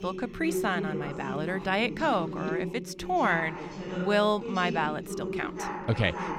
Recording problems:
background chatter; loud; throughout; 2 voices, 6 dB below the speech

